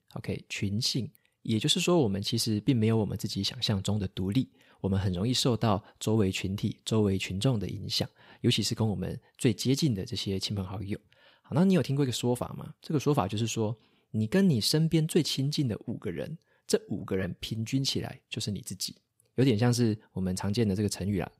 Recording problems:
none

